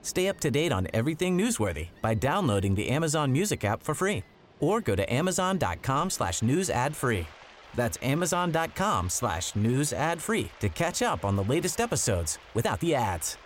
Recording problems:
rain or running water; faint; throughout; 25 dB below the speech
uneven, jittery; strongly; from 2 to 13 s

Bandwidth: 16 kHz